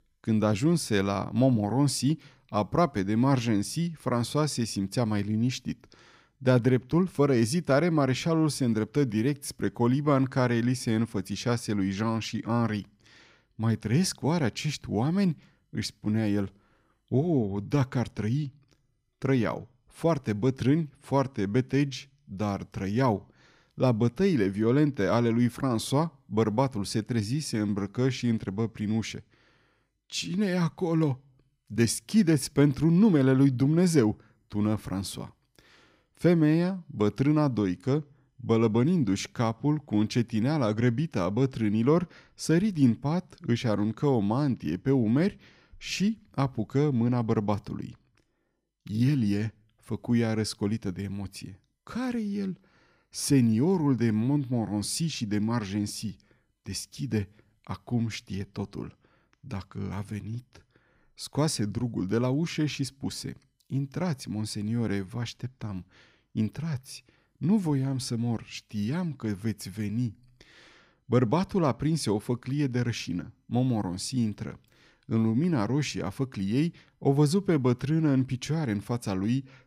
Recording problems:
none

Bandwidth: 15.5 kHz